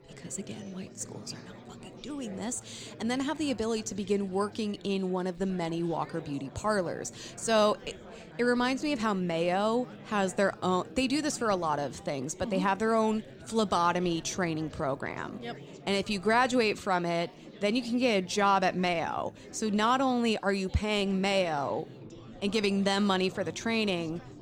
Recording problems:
chatter from many people; noticeable; throughout; 20 dB below the speech

